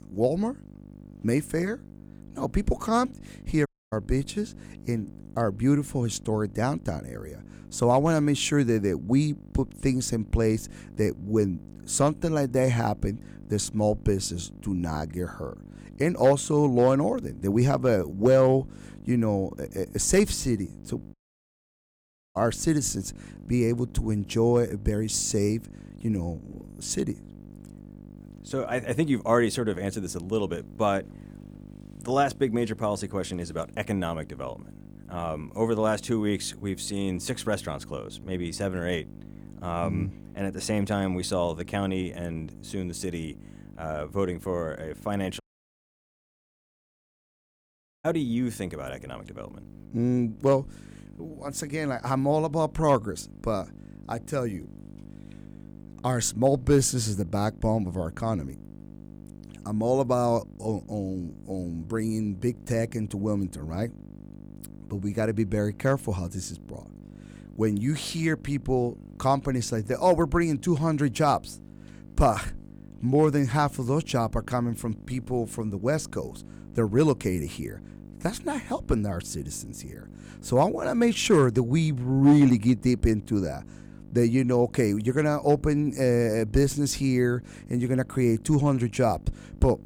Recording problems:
electrical hum; faint; throughout; 50 Hz, 25 dB below the speech
audio cutting out; at 3.5 s, at 21 s for 1 s and at 45 s for 2.5 s

